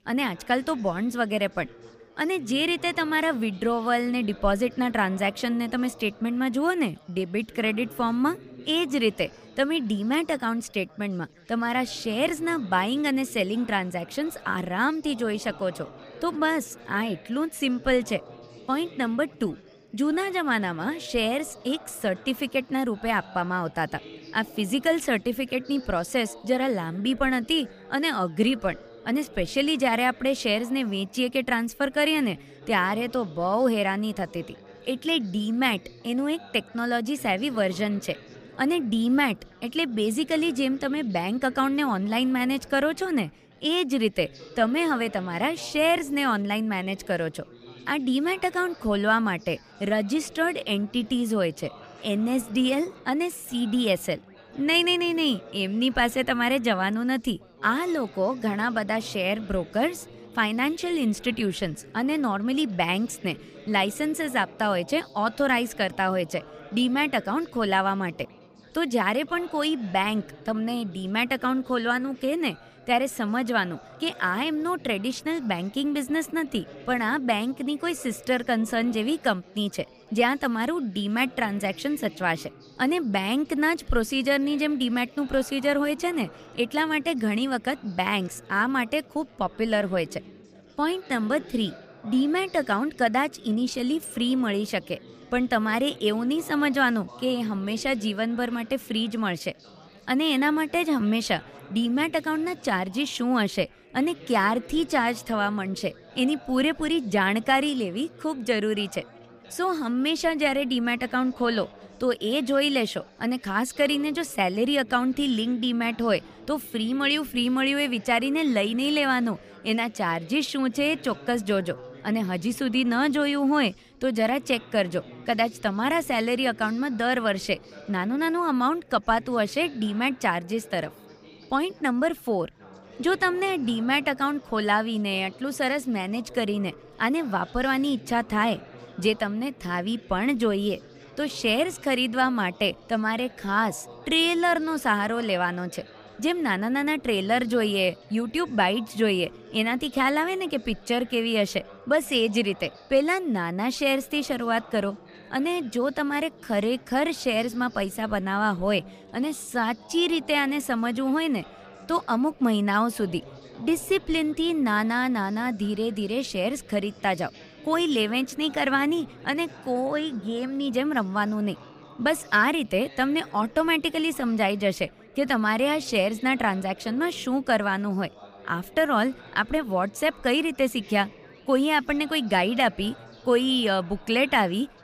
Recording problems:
background chatter; faint; throughout; 4 voices, 20 dB below the speech

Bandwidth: 15 kHz